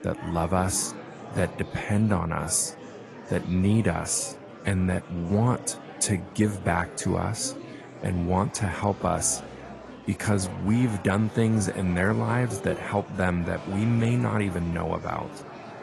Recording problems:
garbled, watery; slightly; nothing above 11 kHz
murmuring crowd; noticeable; throughout; 15 dB below the speech

